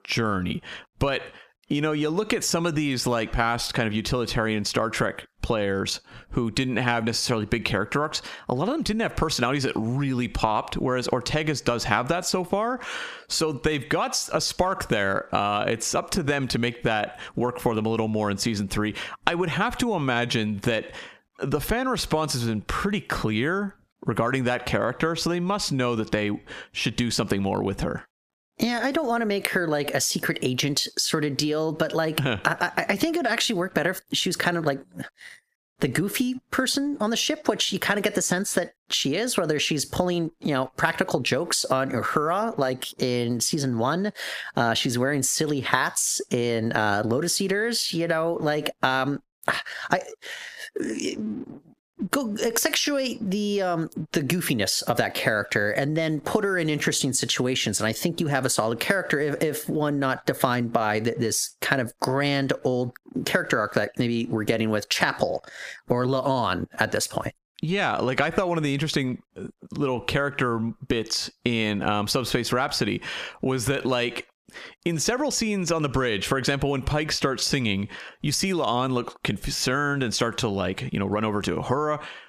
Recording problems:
squashed, flat; heavily

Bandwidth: 15 kHz